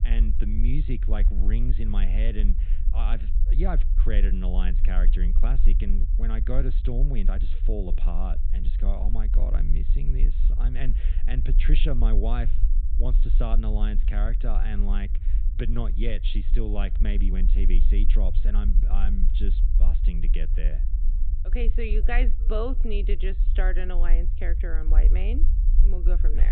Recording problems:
high frequencies cut off; severe; nothing above 4 kHz
low rumble; noticeable; throughout; 10 dB below the speech
abrupt cut into speech; at the end

